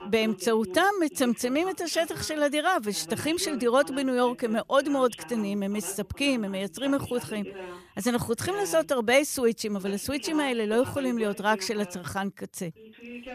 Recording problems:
voice in the background; noticeable; throughout; 15 dB below the speech

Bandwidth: 14.5 kHz